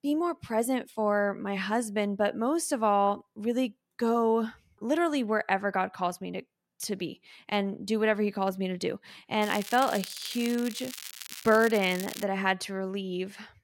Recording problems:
crackling; noticeable; from 9.5 to 12 s; 10 dB below the speech

